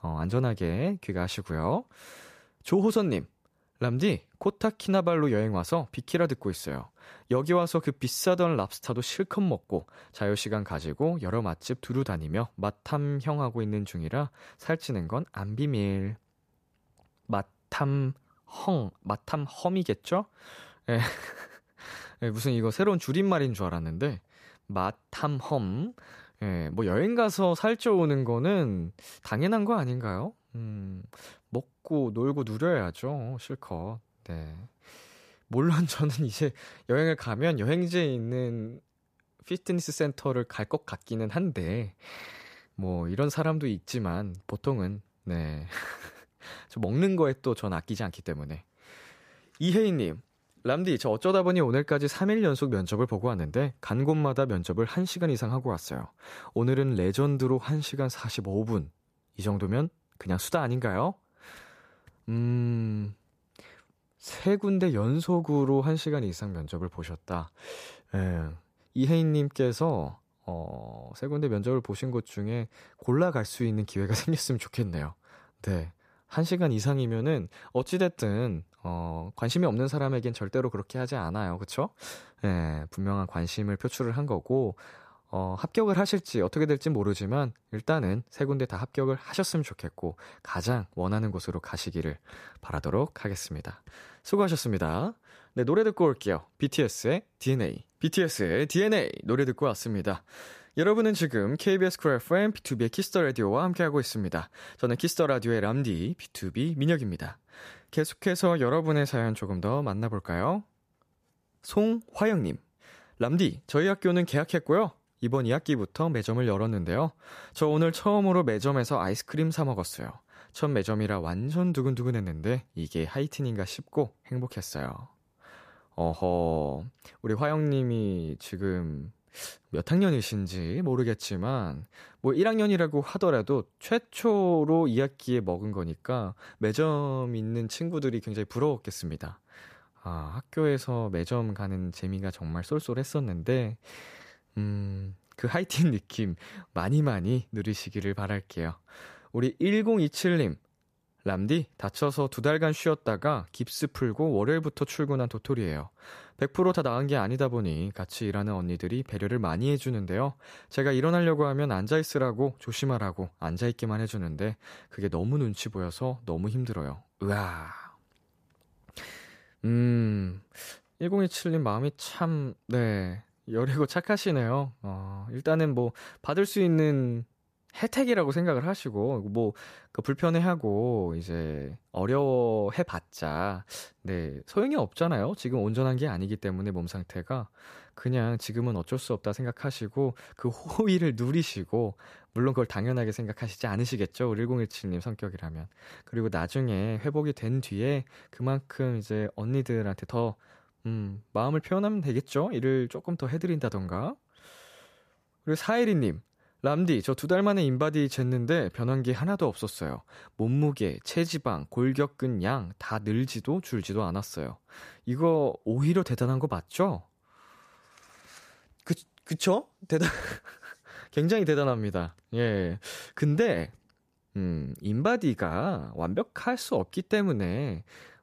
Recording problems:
none

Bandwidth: 14.5 kHz